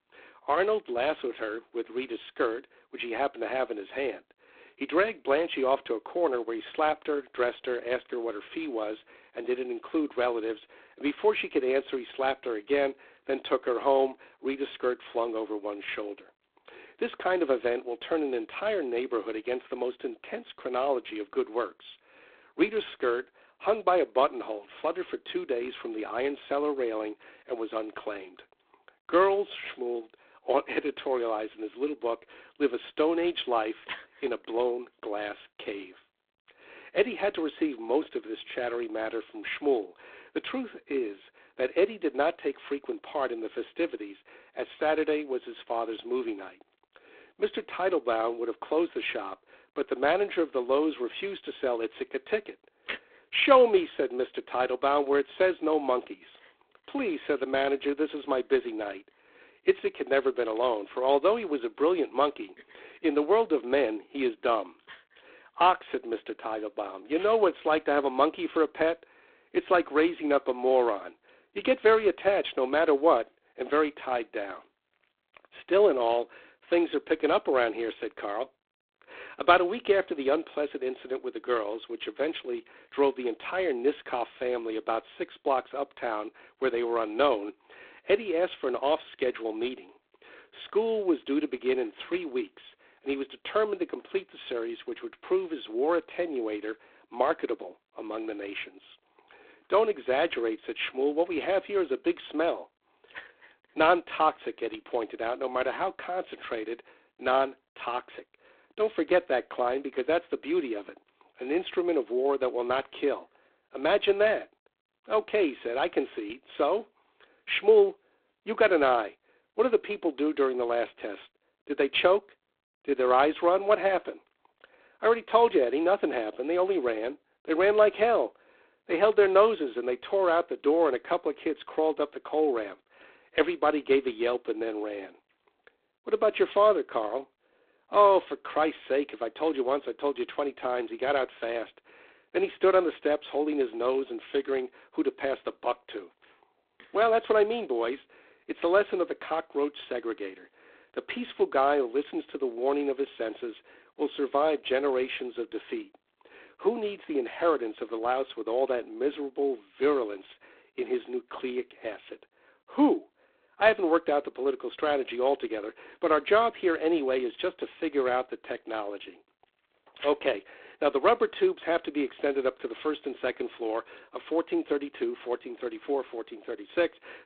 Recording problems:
phone-call audio; poor line; nothing above 3.5 kHz

